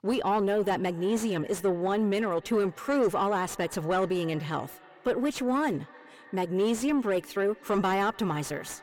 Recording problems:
echo of what is said; faint; throughout; 300 ms later, 25 dB below the speech
distortion; slight; 10 dB below the speech

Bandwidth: 17.5 kHz